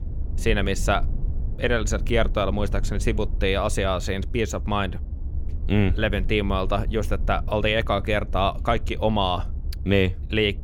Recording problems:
low rumble; faint; throughout; 20 dB below the speech

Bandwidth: 17 kHz